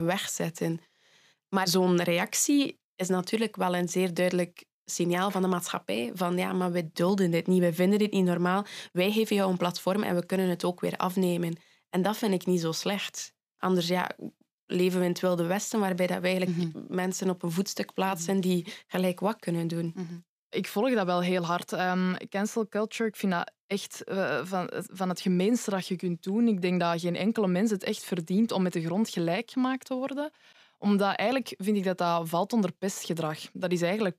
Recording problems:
abrupt cut into speech; at the start

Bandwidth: 15 kHz